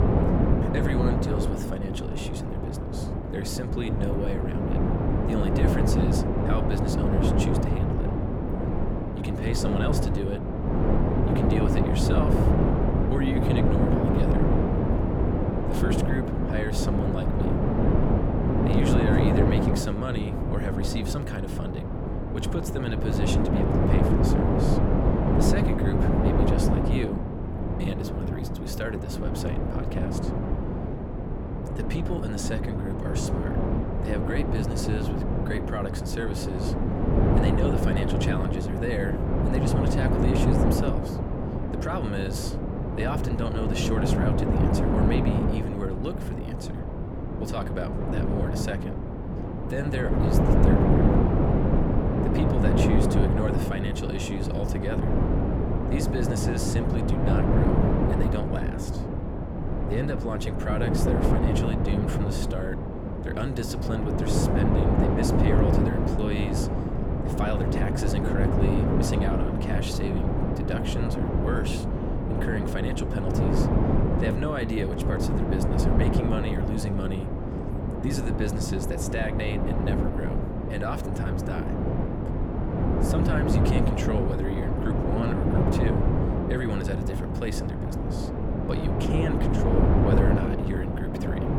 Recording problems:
wind noise on the microphone; heavy; 4 dB above the speech

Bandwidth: 18 kHz